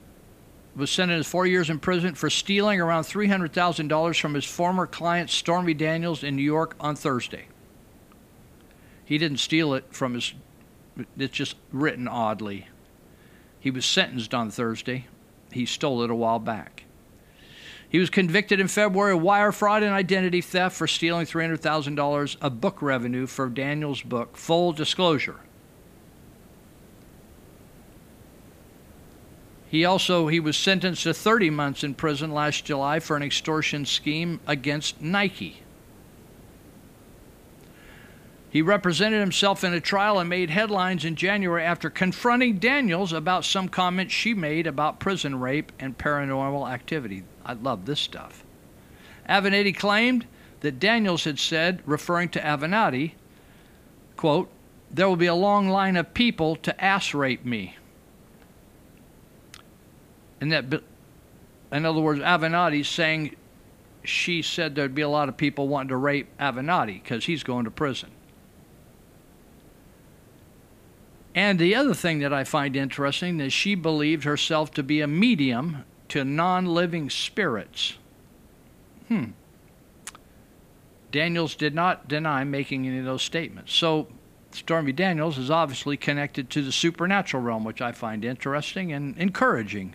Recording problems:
hiss; faint; throughout; 30 dB below the speech

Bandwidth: 15 kHz